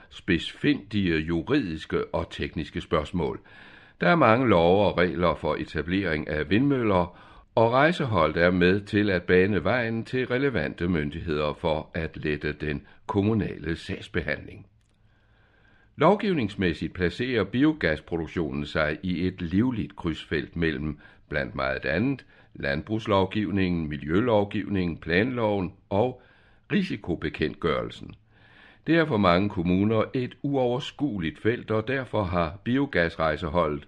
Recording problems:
muffled; very slightly; fading above 3 kHz

